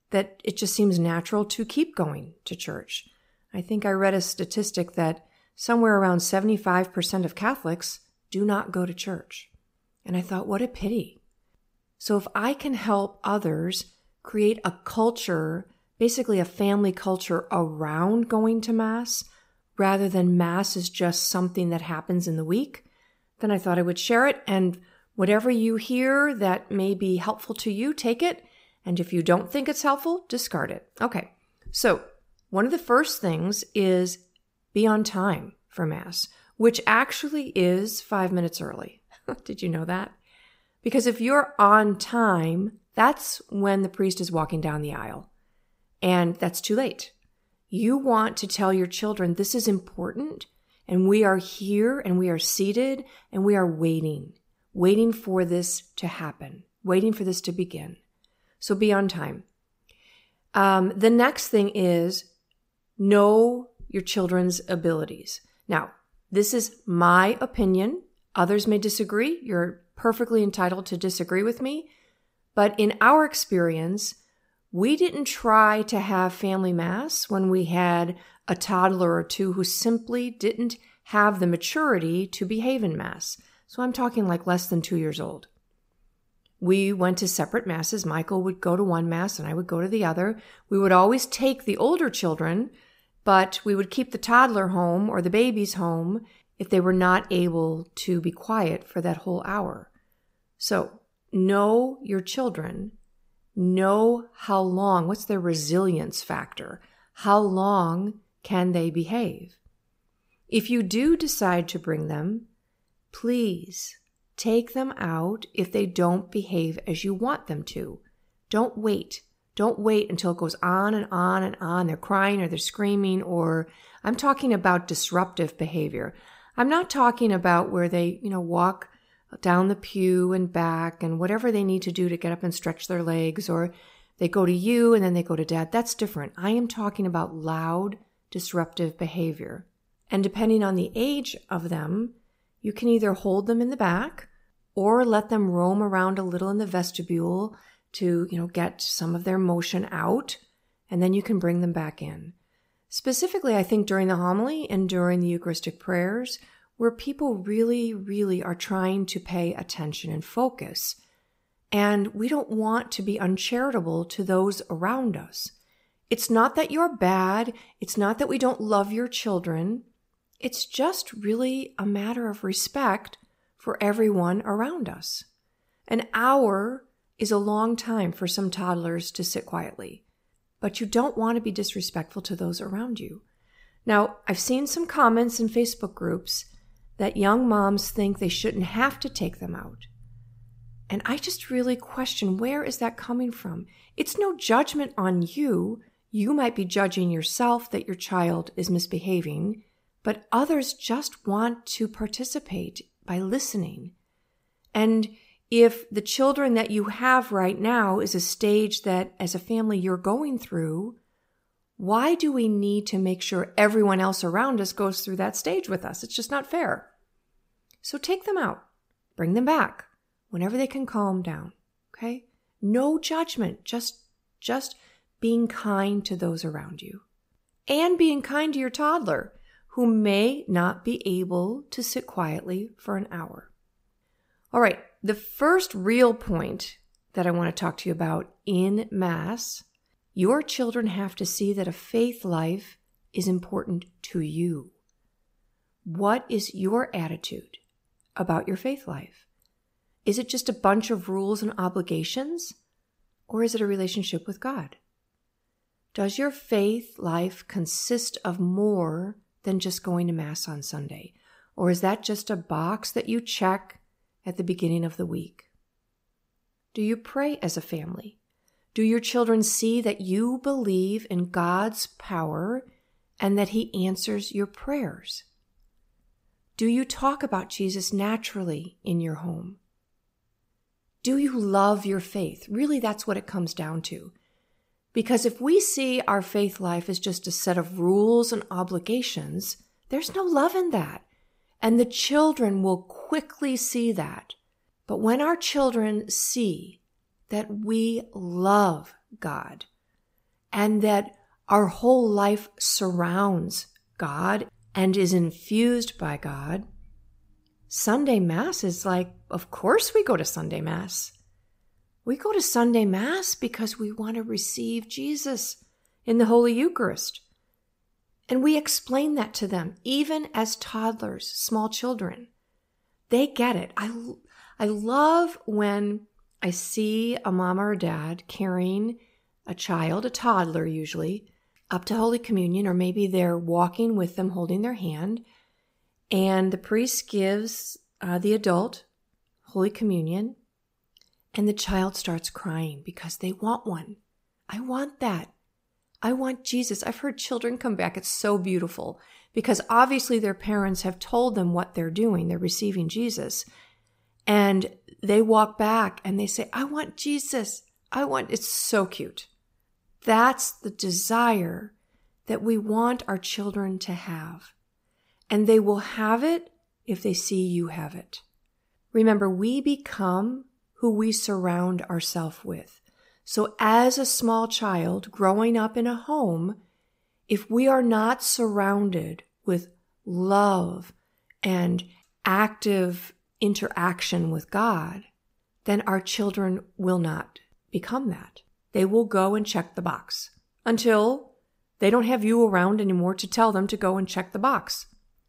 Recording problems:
none

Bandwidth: 15.5 kHz